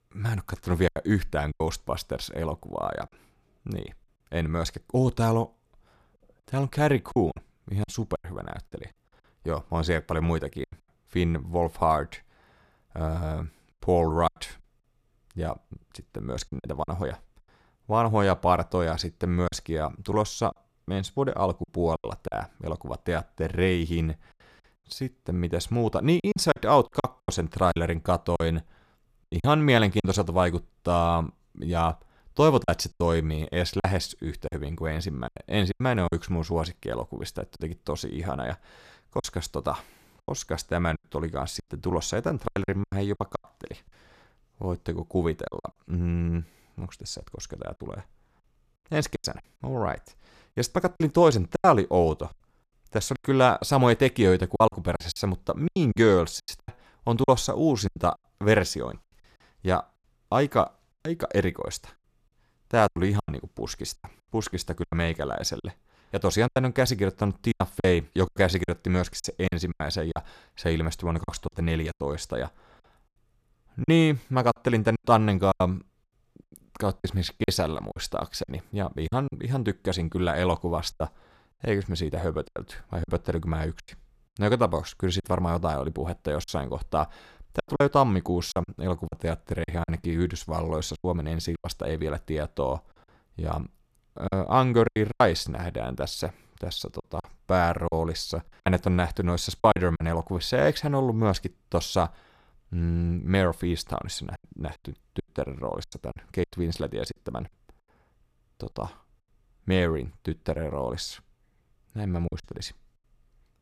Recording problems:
choppy; very; 8% of the speech affected

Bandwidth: 14.5 kHz